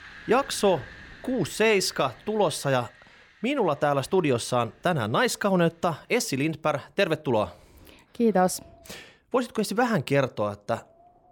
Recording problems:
wind in the background; faint; throughout; 25 dB below the speech

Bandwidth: 18 kHz